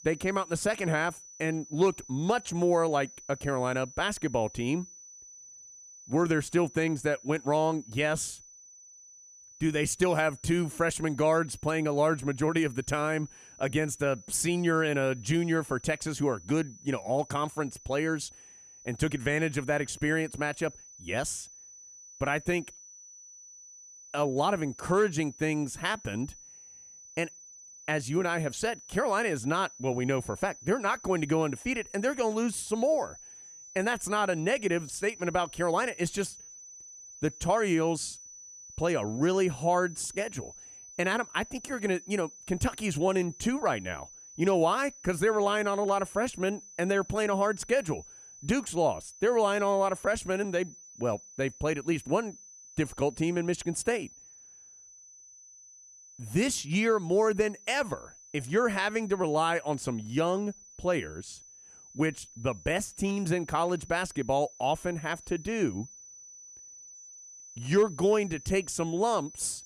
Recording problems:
high-pitched whine; noticeable; throughout; 6 kHz, 20 dB below the speech

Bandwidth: 14.5 kHz